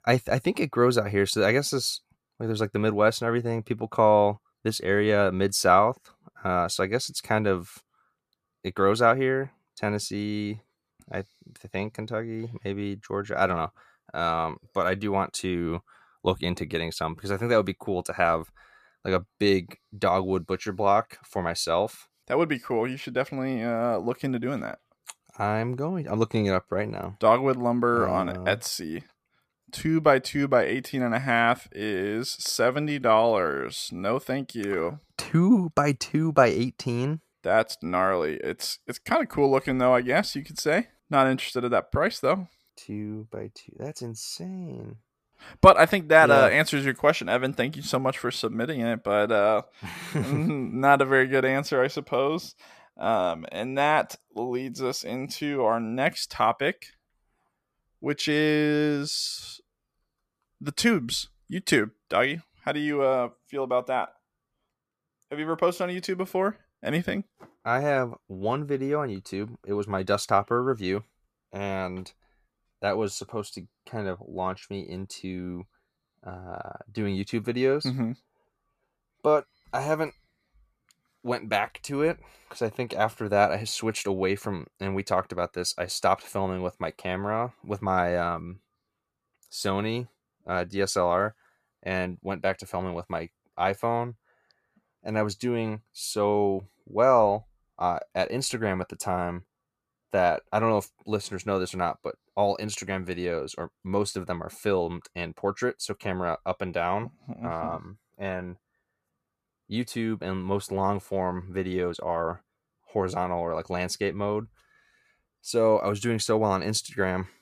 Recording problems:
none

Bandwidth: 14.5 kHz